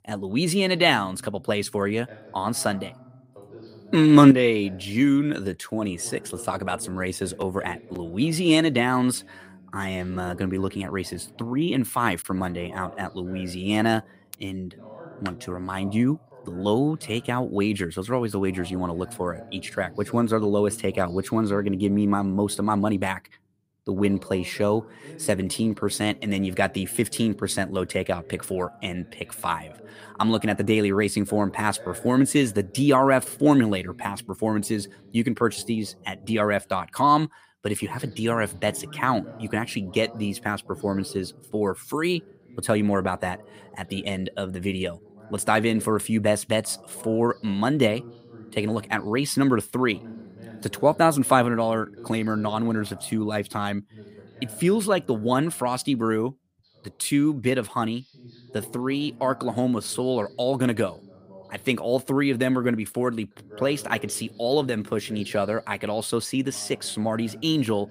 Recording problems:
voice in the background; faint; throughout; 20 dB below the speech

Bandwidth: 15.5 kHz